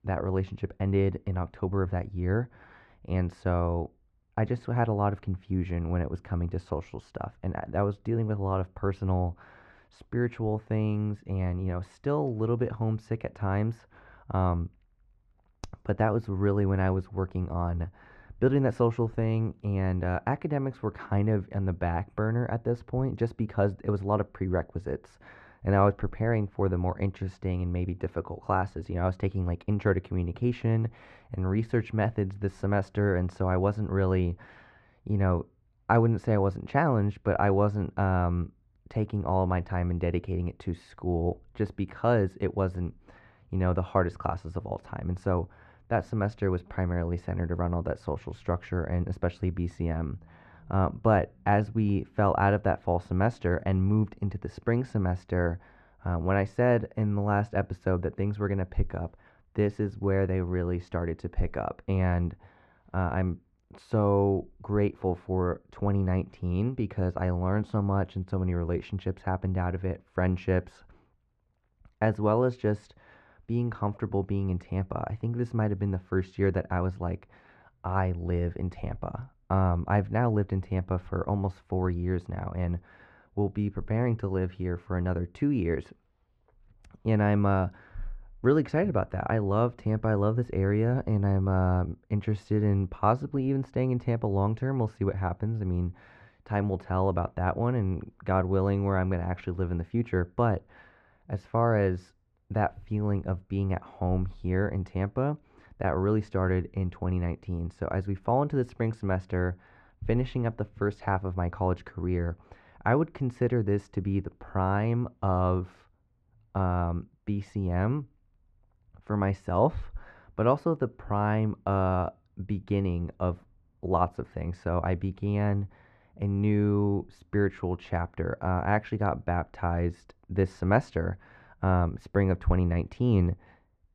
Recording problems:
muffled; very; fading above 1.5 kHz

